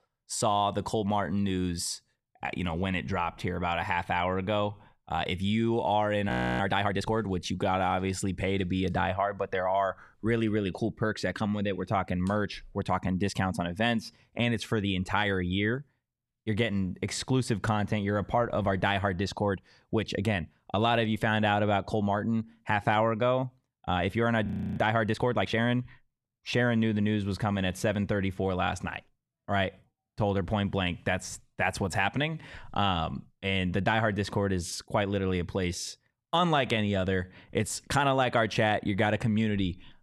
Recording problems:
audio freezing; at 6.5 s and at 24 s

